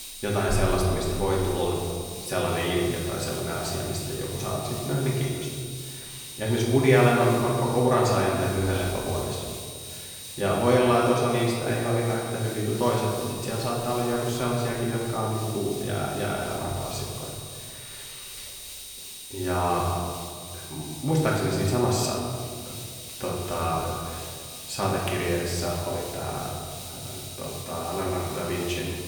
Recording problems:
off-mic speech; far
room echo; noticeable; dies away in 1.7 s
high-pitched whine; noticeable; throughout; 9 kHz, 15 dB below the speech
hiss; noticeable; throughout; 15 dB below the speech

